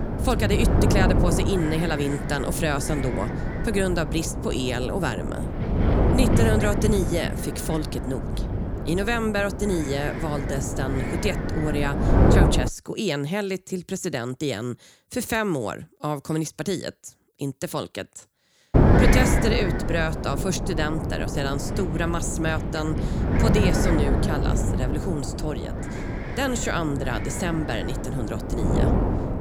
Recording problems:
wind noise on the microphone; heavy; until 13 s and from 19 s on; 2 dB below the speech

